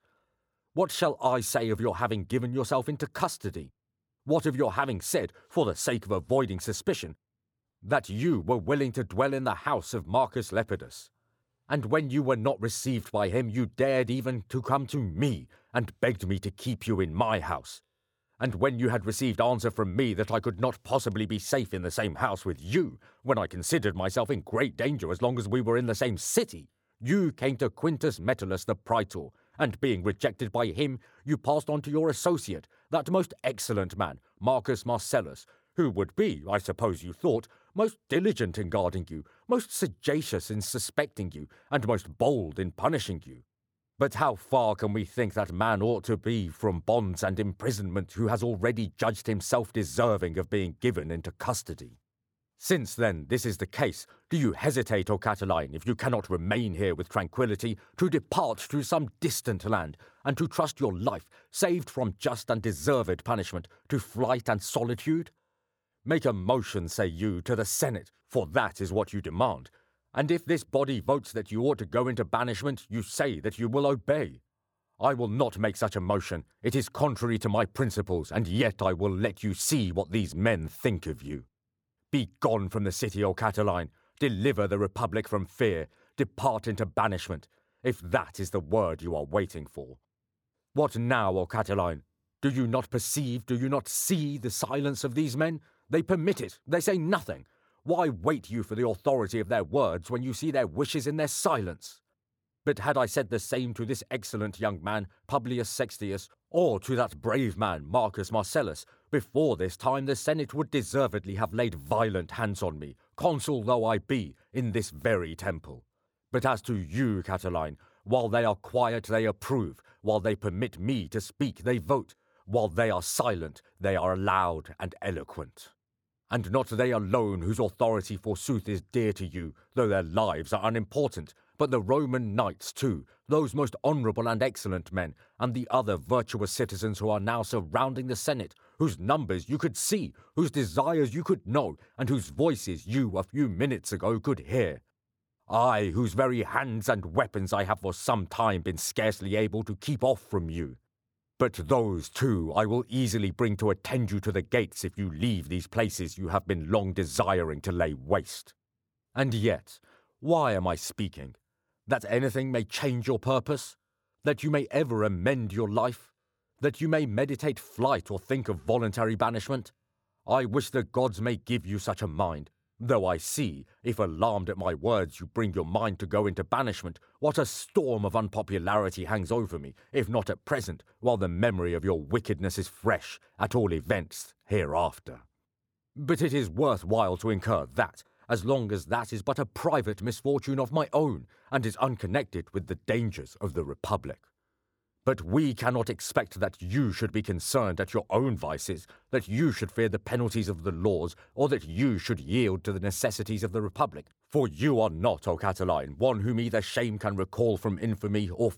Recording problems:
none

